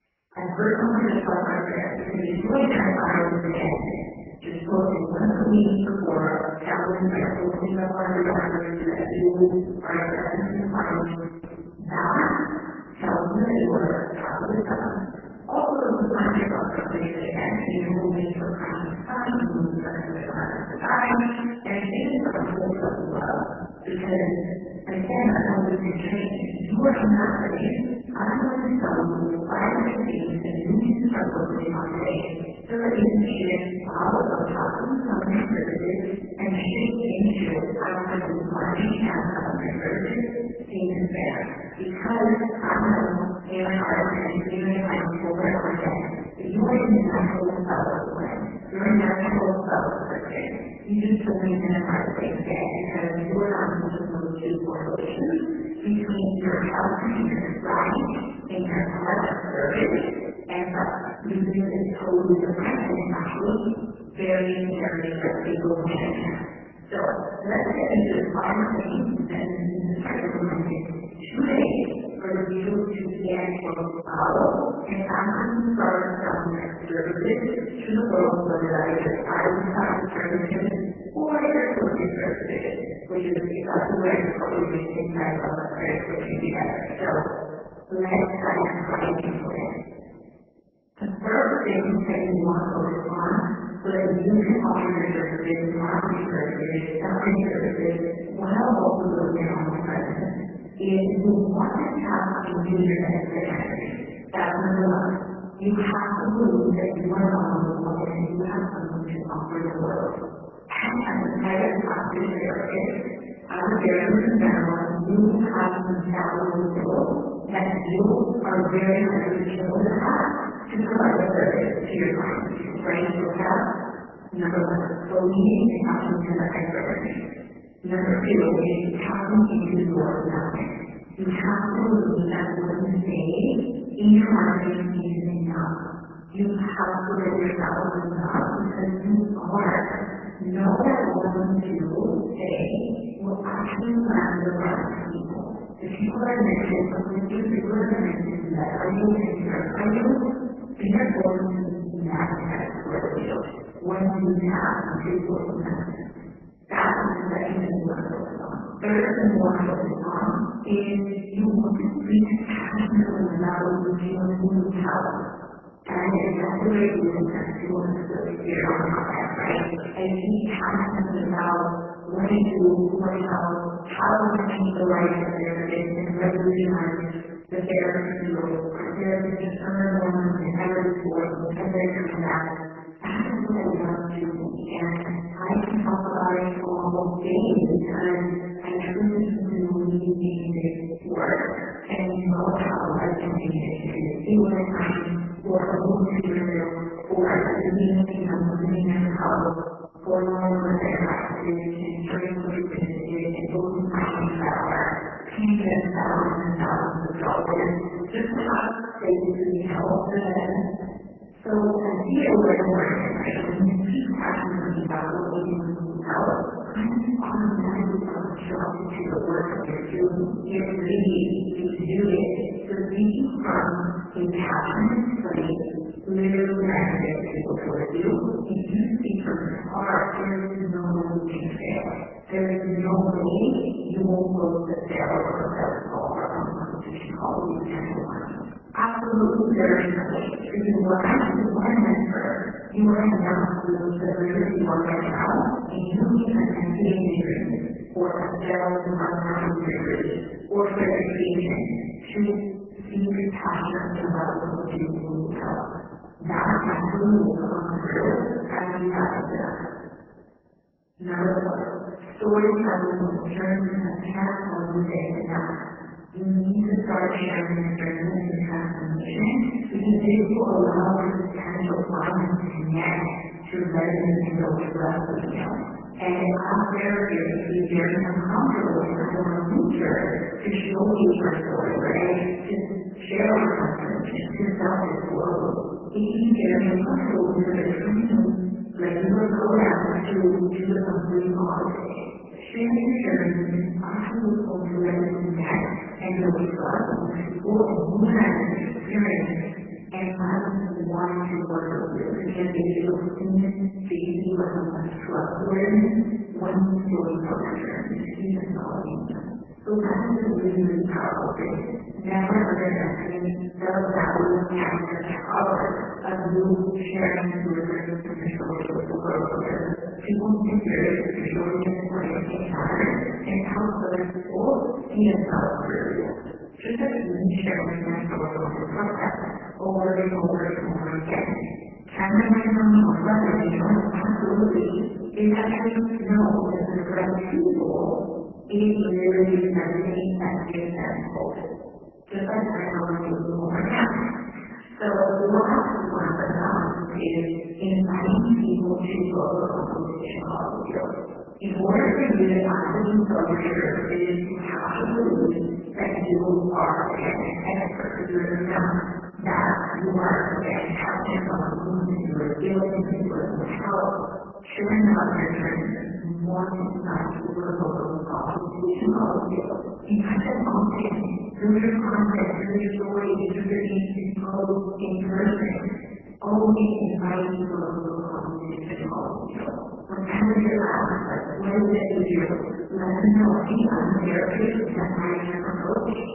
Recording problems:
room echo; strong; dies away in 1.5 s
off-mic speech; far
garbled, watery; badly; nothing above 3 kHz

